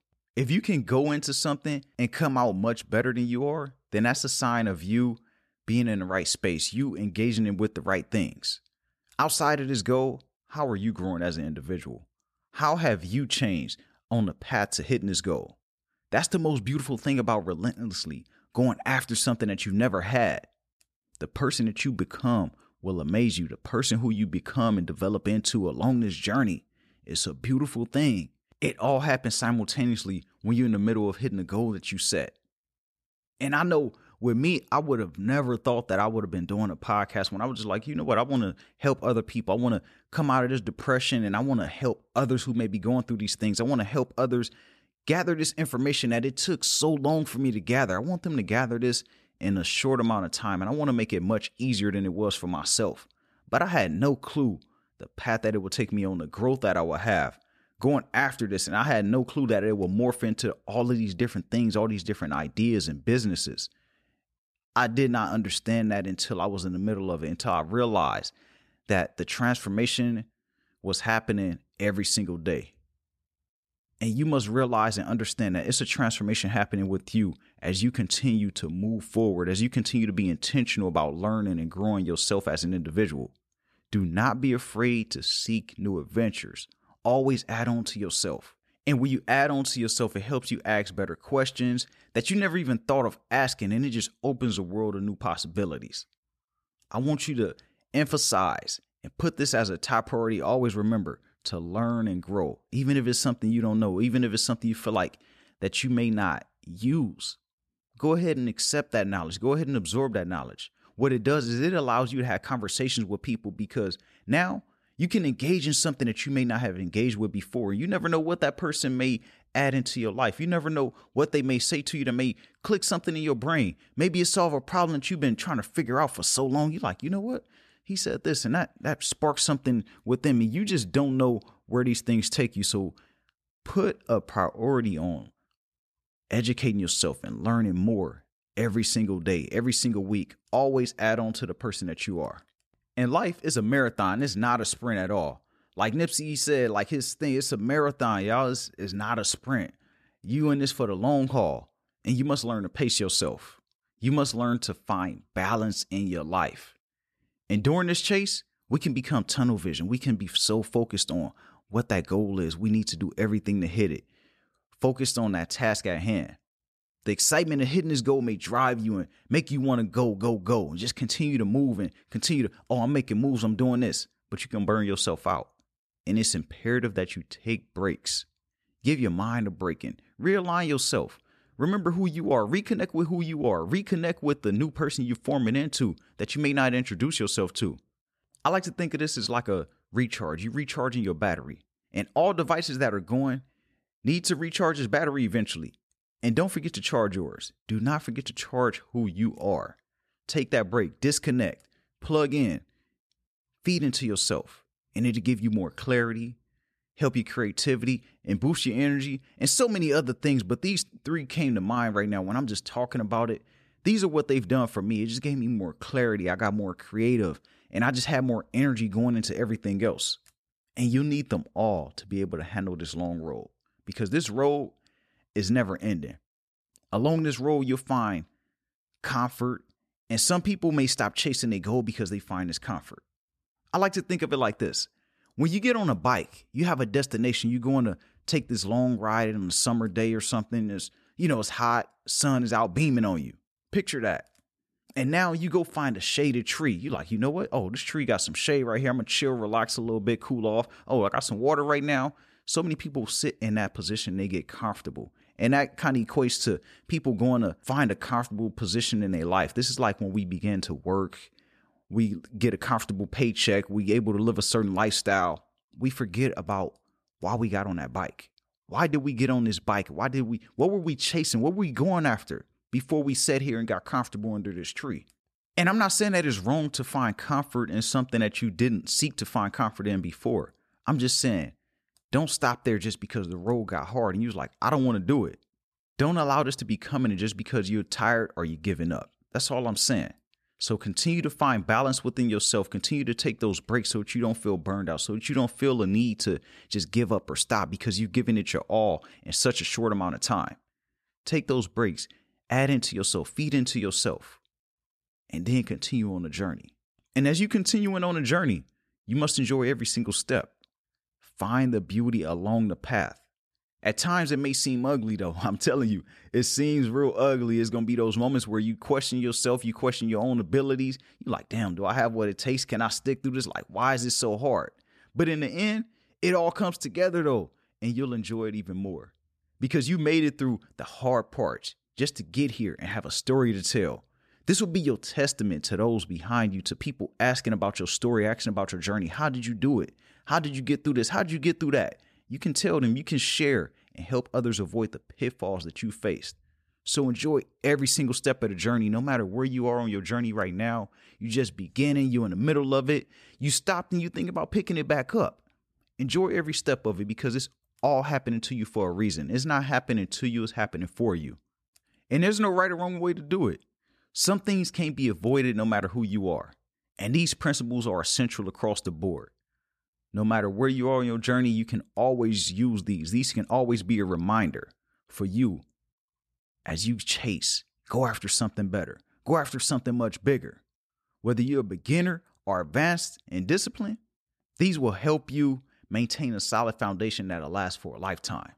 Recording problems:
none

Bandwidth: 14 kHz